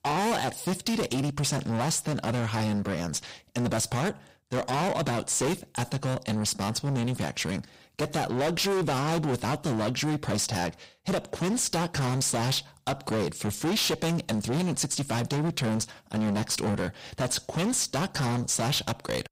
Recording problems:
distortion; heavy; 26% of the sound clipped

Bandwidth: 15.5 kHz